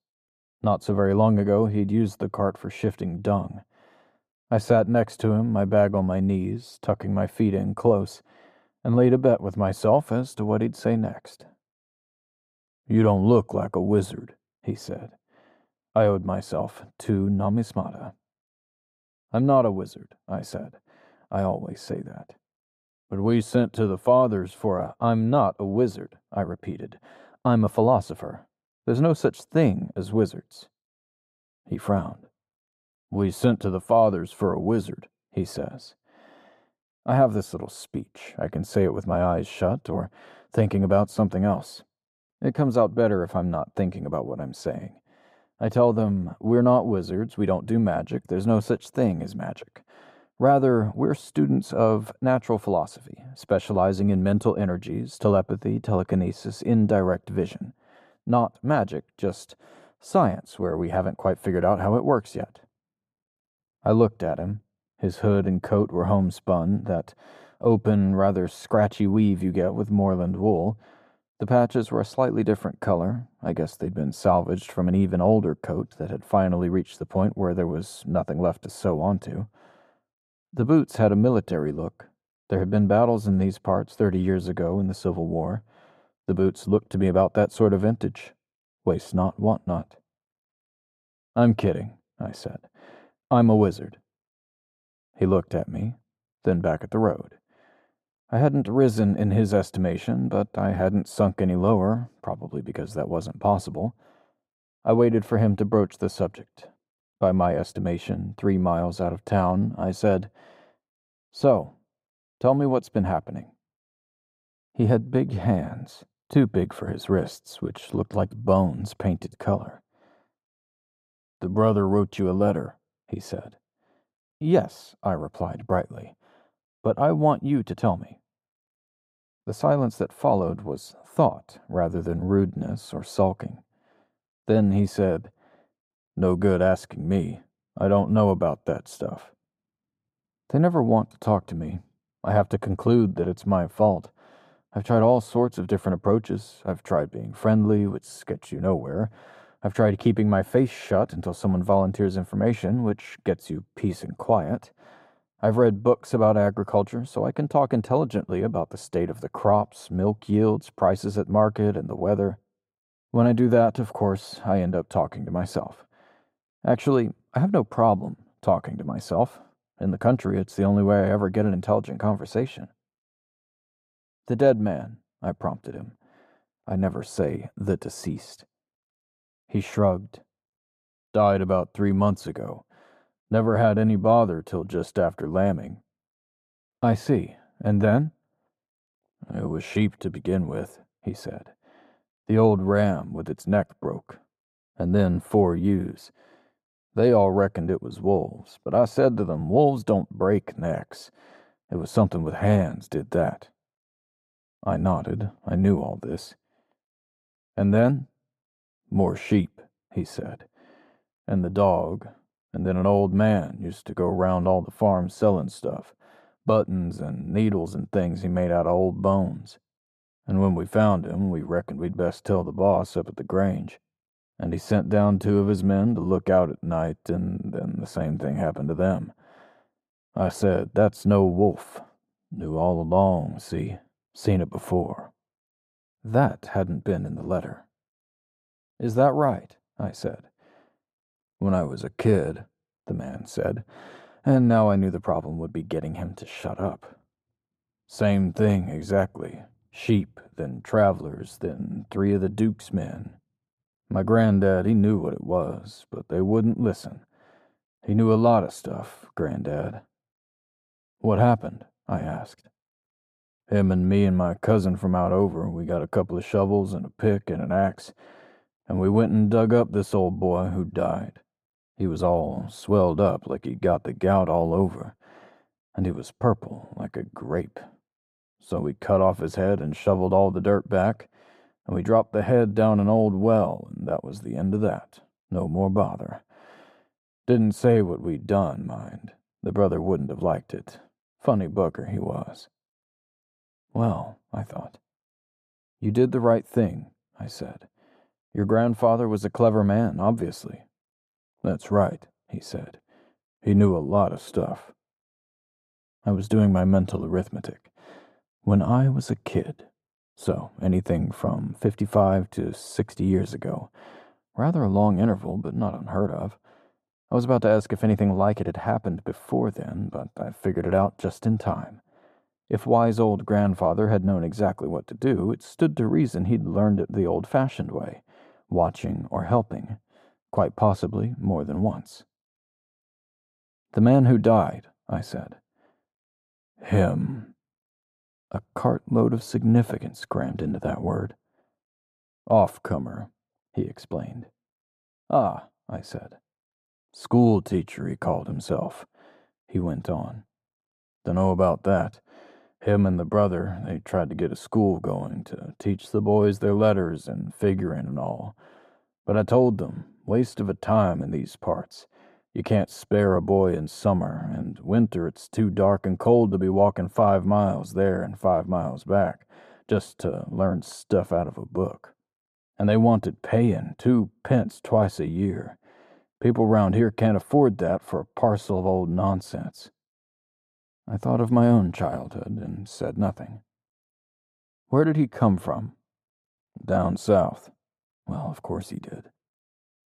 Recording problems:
muffled; slightly; fading above 1 kHz

